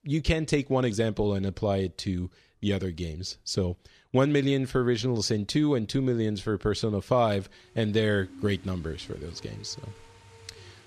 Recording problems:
rain or running water; faint; throughout; 20 dB below the speech

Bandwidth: 14 kHz